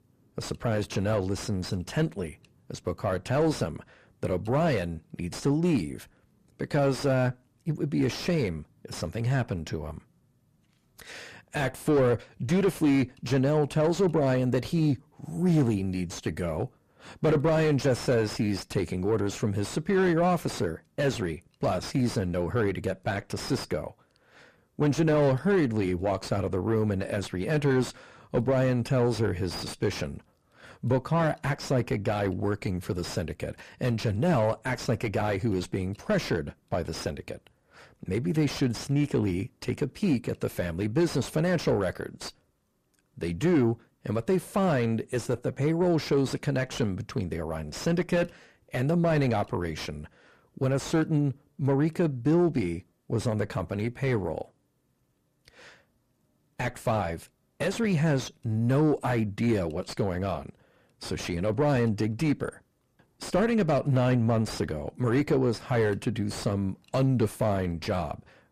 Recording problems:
distortion; heavy; 6 dB below the speech

